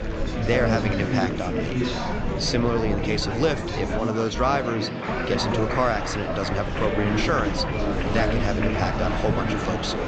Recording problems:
high frequencies cut off; noticeable; nothing above 8 kHz
murmuring crowd; loud; throughout; as loud as the speech
rain or running water; noticeable; throughout; 20 dB below the speech
low rumble; faint; until 4 s and from 5 s on; 25 dB below the speech

